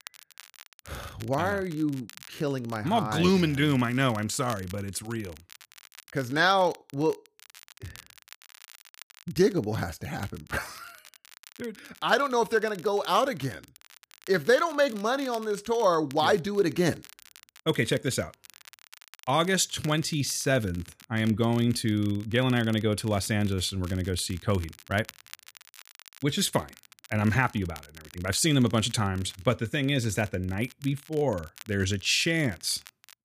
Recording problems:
crackle, like an old record; faint; 20 dB below the speech

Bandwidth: 15 kHz